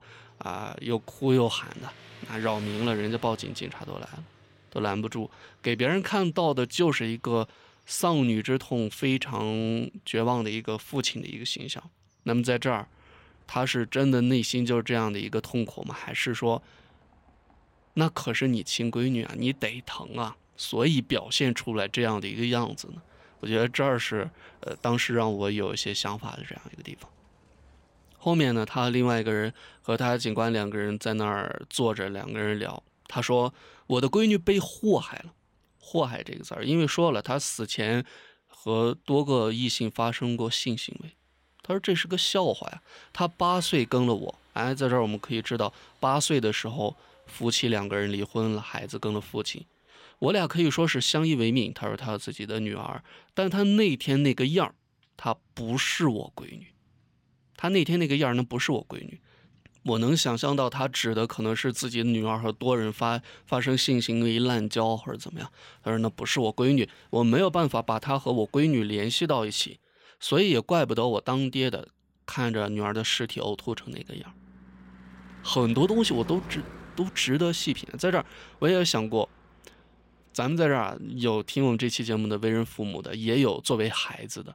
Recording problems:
traffic noise; faint; throughout; 25 dB below the speech

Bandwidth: 16 kHz